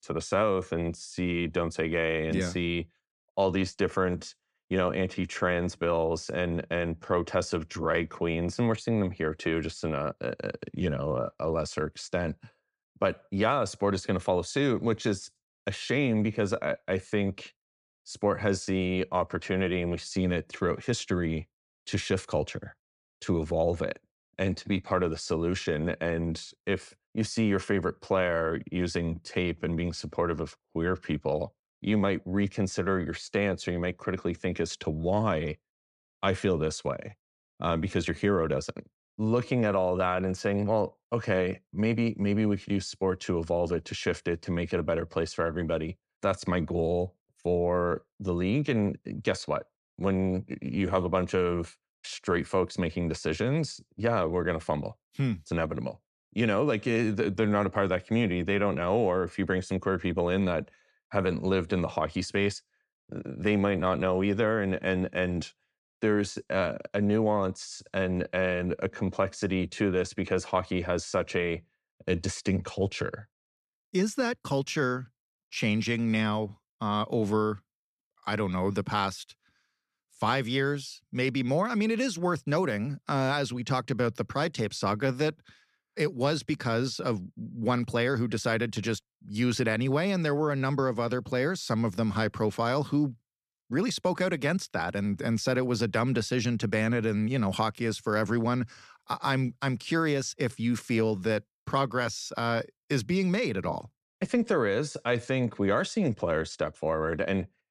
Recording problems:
none

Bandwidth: 13.5 kHz